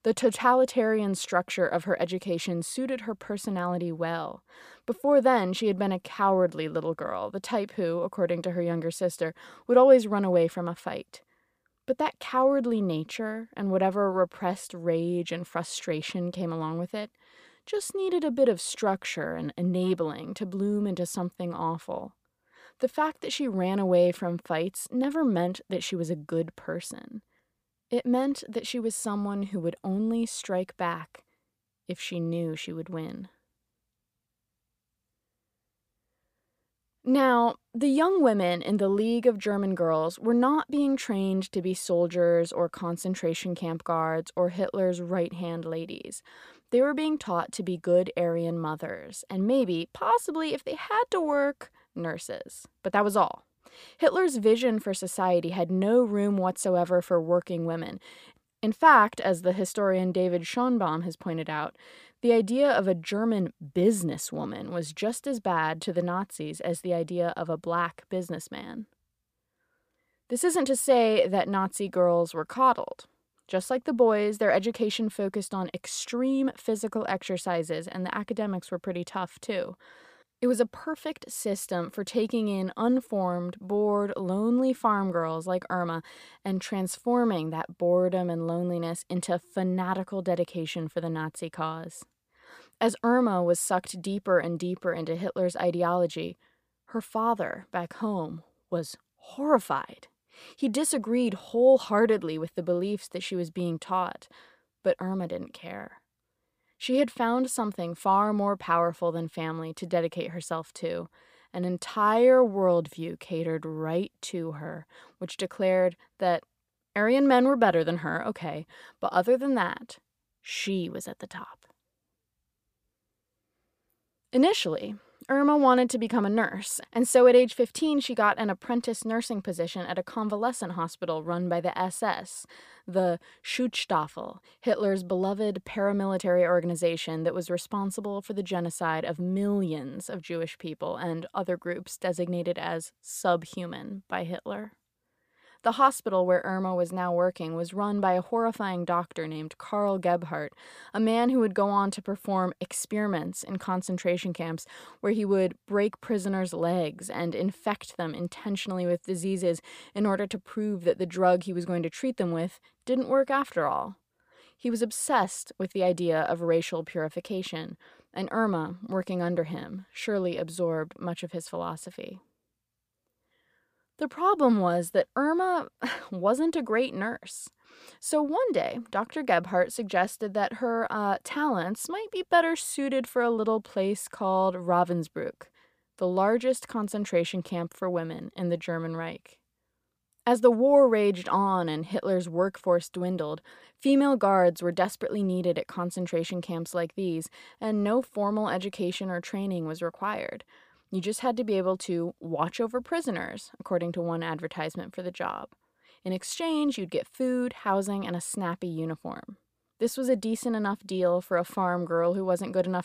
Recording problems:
none

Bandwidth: 15 kHz